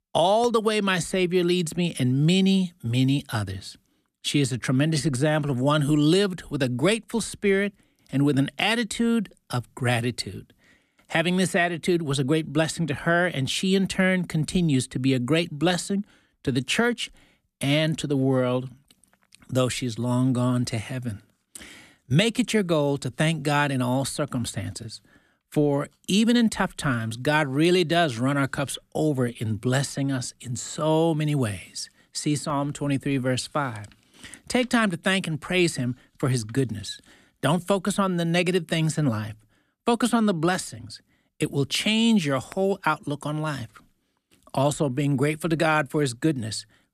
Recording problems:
none

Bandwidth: 14.5 kHz